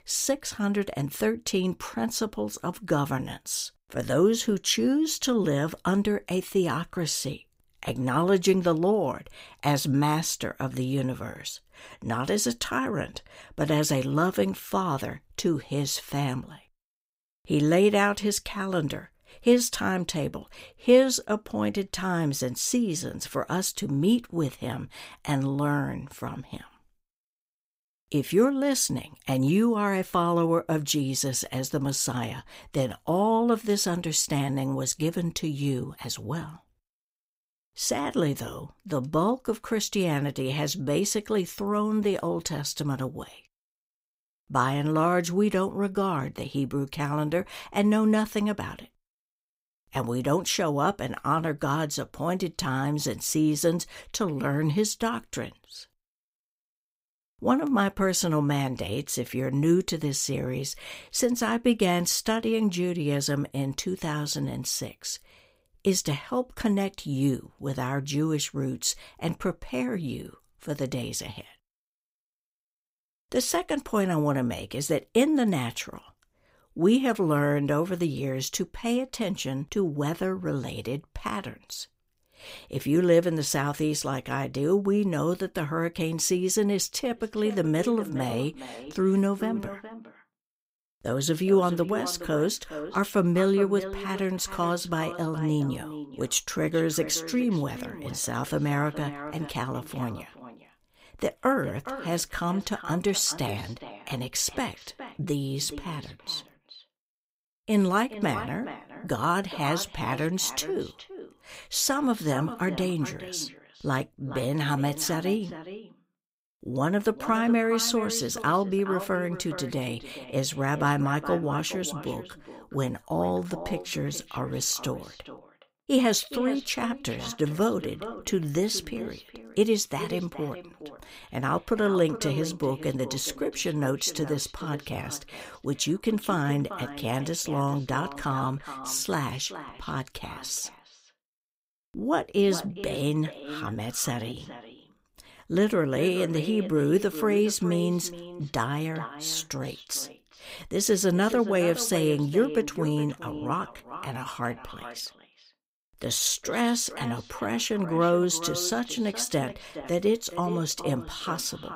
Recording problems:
echo of what is said; noticeable; from 1:27 on; 420 ms later, 15 dB below the speech

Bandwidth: 15.5 kHz